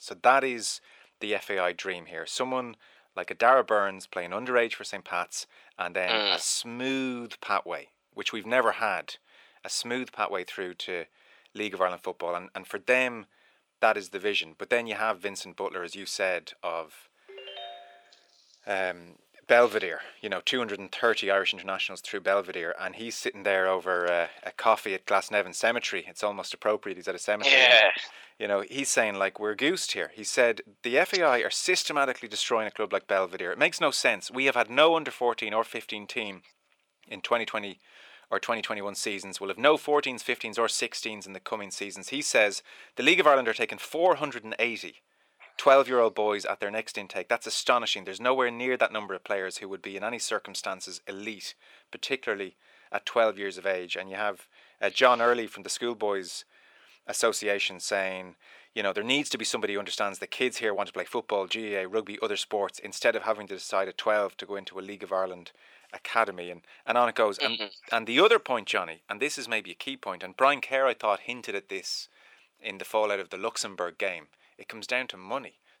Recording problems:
thin; somewhat; fading below 500 Hz
phone ringing; faint; at 17 s; peak 15 dB below the speech

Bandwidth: 18.5 kHz